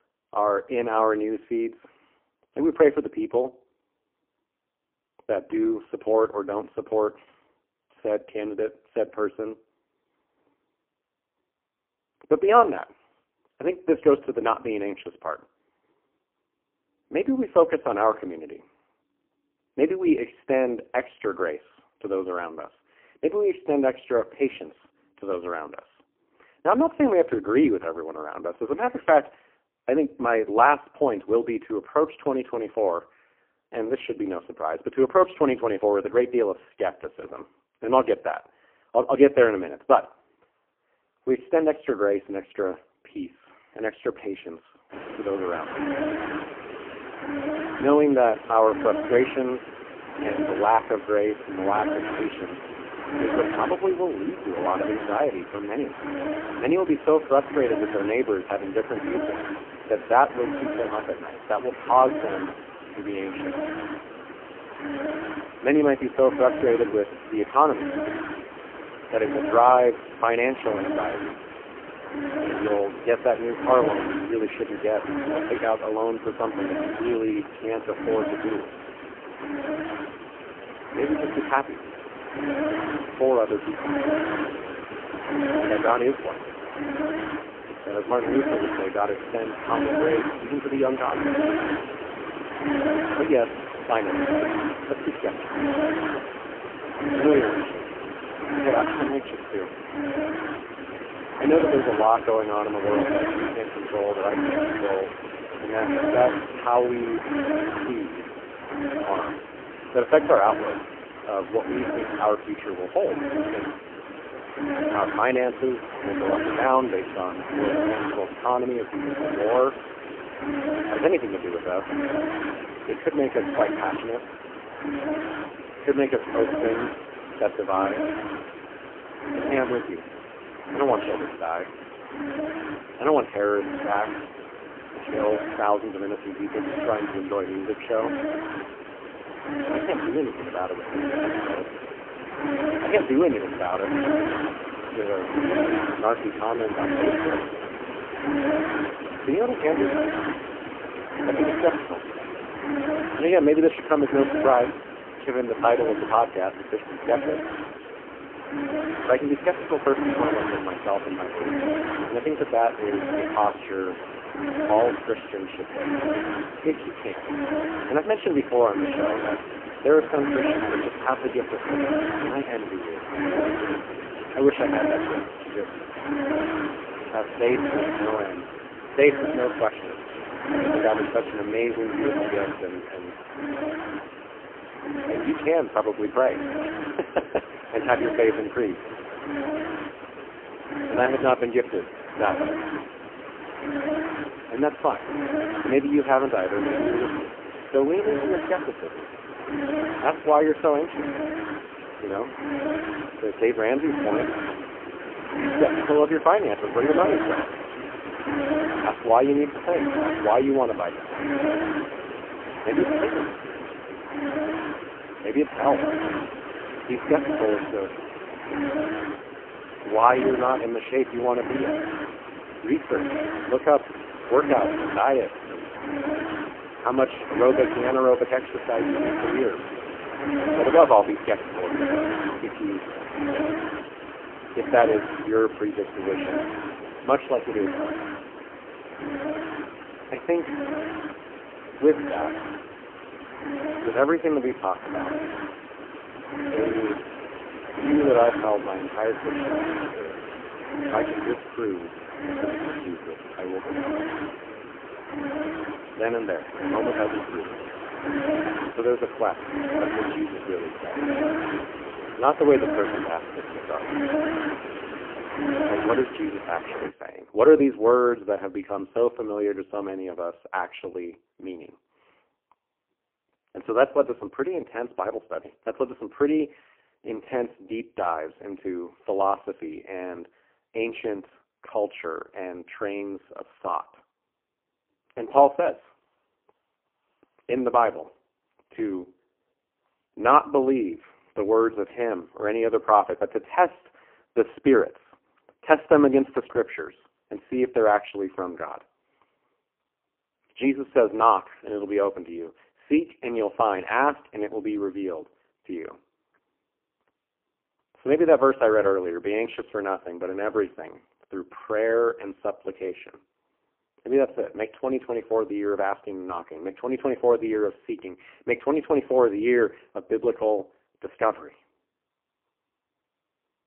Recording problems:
phone-call audio; poor line
hiss; loud; from 45 s to 4:27; 6 dB below the speech

